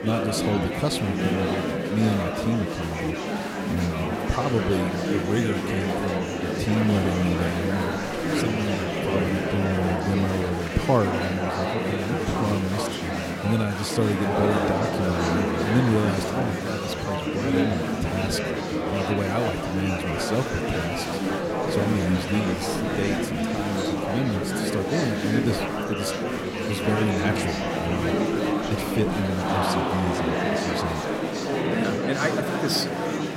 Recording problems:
murmuring crowd; very loud; throughout; 1 dB above the speech

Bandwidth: 16 kHz